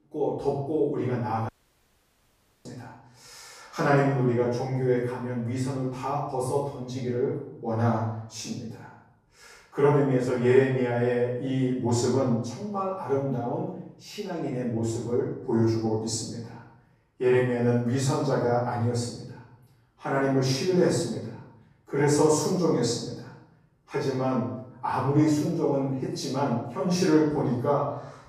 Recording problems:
off-mic speech; far
room echo; noticeable; dies away in 0.7 s
audio cutting out; at 1.5 s for 1 s

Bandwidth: 15 kHz